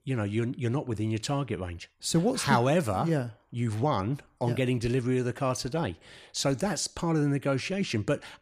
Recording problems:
none

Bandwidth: 15.5 kHz